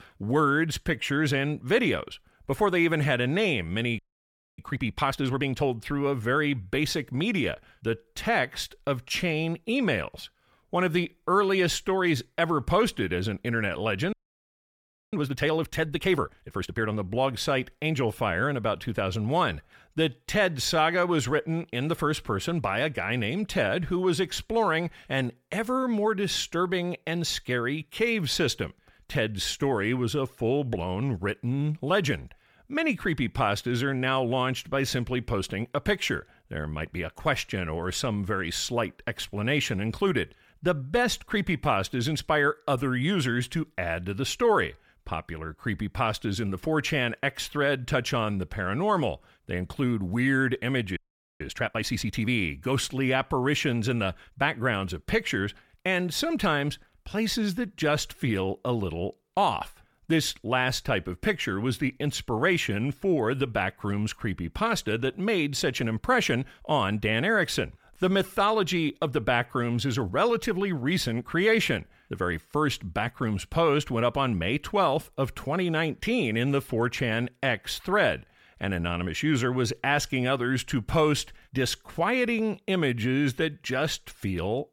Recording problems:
audio freezing; at 4 s for 0.5 s, at 14 s for 1 s and at 51 s

